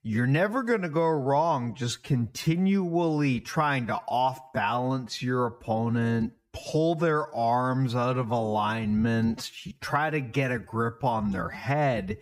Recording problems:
wrong speed, natural pitch; too slow; 0.6 times normal speed

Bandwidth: 15.5 kHz